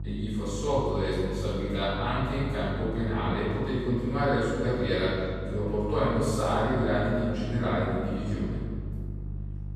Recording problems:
room echo; strong; dies away in 1.9 s
off-mic speech; far
electrical hum; faint; throughout; 50 Hz, 20 dB below the speech

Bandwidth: 14.5 kHz